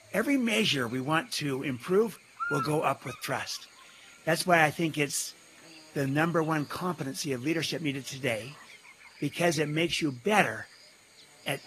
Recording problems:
garbled, watery; slightly; nothing above 14.5 kHz
electrical hum; noticeable; throughout; 50 Hz, 15 dB below the speech

